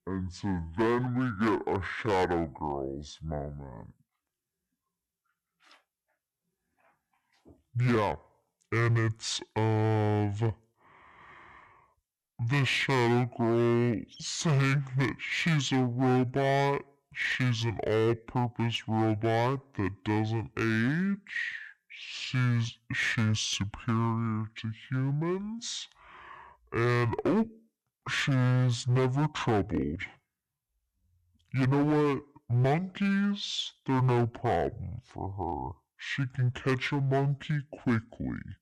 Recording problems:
wrong speed and pitch; too slow and too low; 0.6 times normal speed
distortion; slight; 9% of the sound clipped

